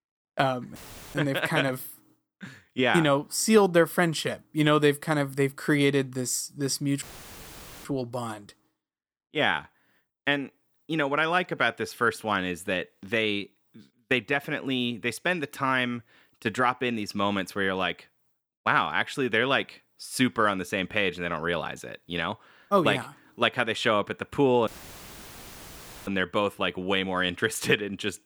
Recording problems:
audio cutting out; filled with static; at 1 s, at 7 s for 1 s and at 25 s for 1.5 s

